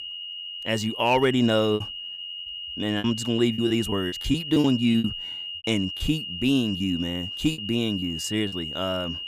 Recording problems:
high-pitched whine; loud; throughout; 3 kHz, 7 dB below the speech
choppy; very; 9% of the speech affected

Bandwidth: 15.5 kHz